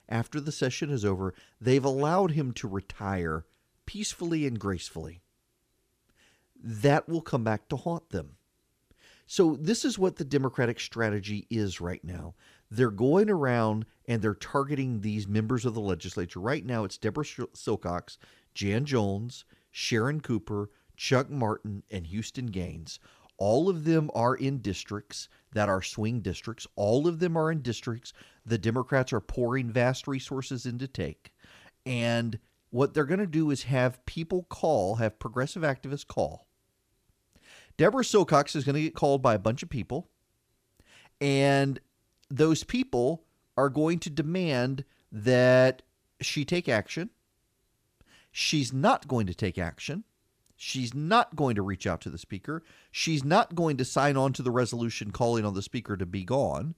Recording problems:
none

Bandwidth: 15 kHz